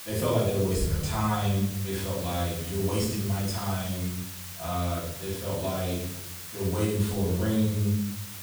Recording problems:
off-mic speech; far
room echo; noticeable; dies away in 0.9 s
hiss; loud; throughout; 9 dB below the speech

